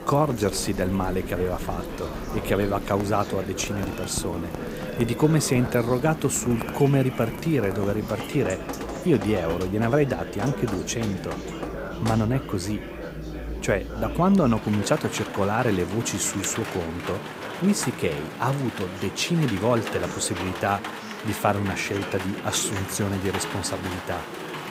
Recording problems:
rain or running water; noticeable; throughout; 10 dB below the speech
murmuring crowd; noticeable; throughout; 10 dB below the speech

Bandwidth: 15.5 kHz